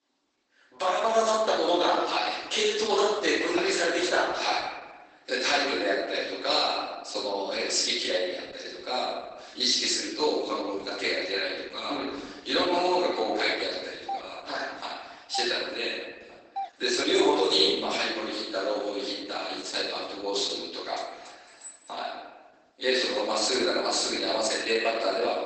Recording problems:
off-mic speech; far
garbled, watery; badly
room echo; noticeable; dies away in 1.1 s
thin; somewhat; fading below 300 Hz
doorbell; noticeable; from 14 to 17 s; peak 10 dB below the speech
clattering dishes; faint; at 21 s; peak 15 dB below the speech

